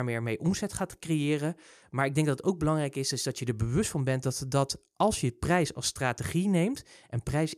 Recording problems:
abrupt cut into speech; at the start

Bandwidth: 14.5 kHz